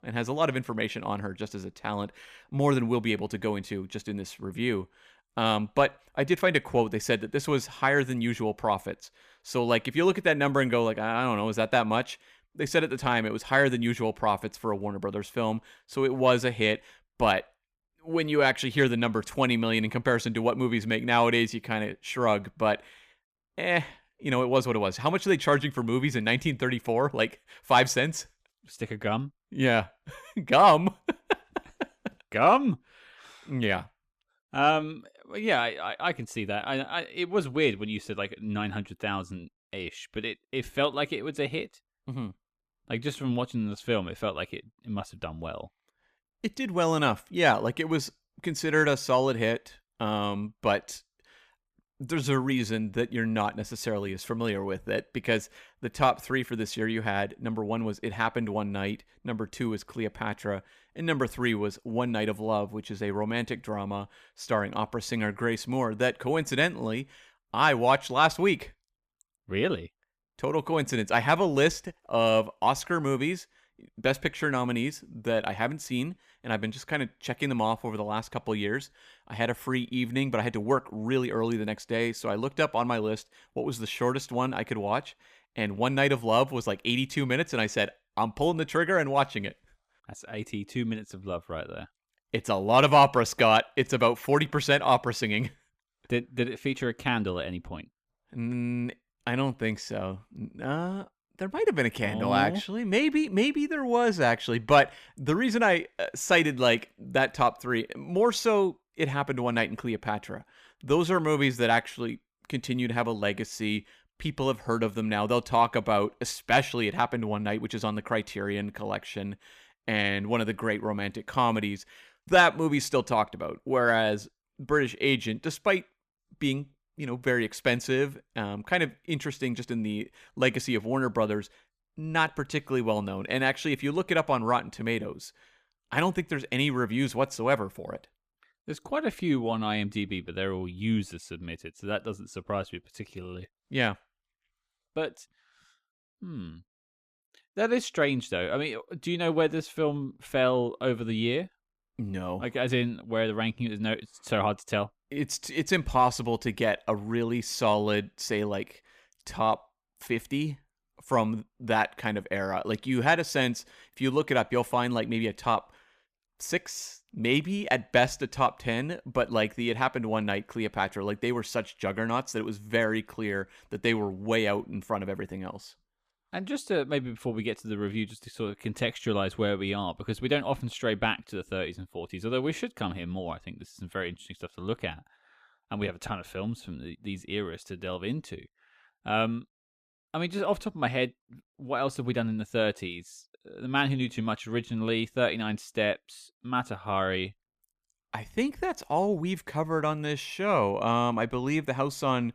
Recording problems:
none

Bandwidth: 15 kHz